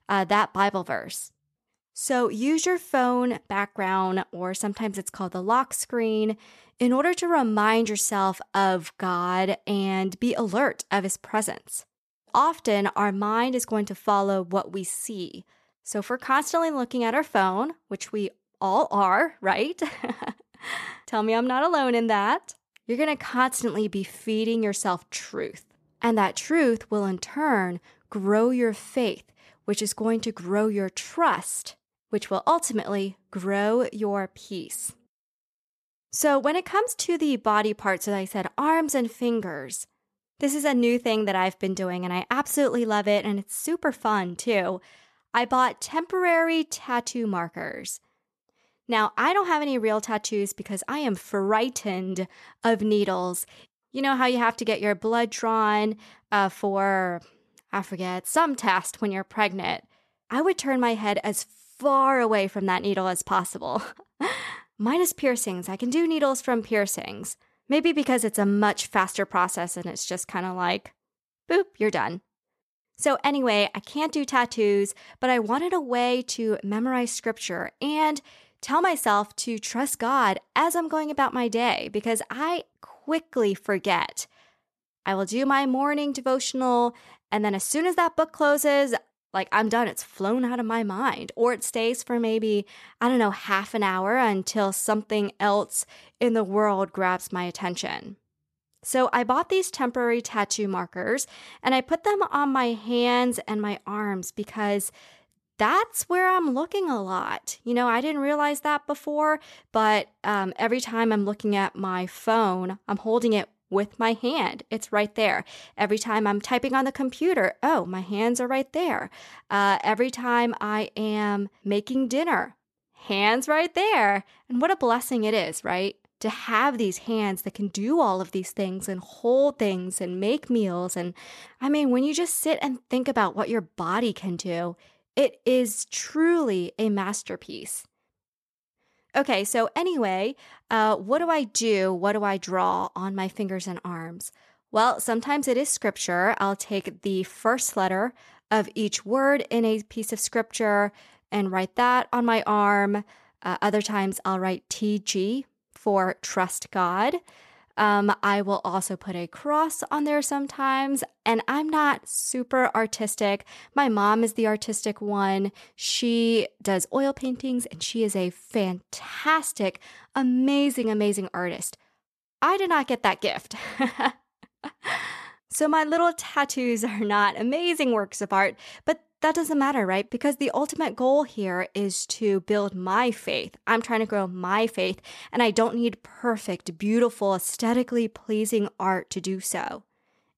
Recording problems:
none

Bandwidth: 13.5 kHz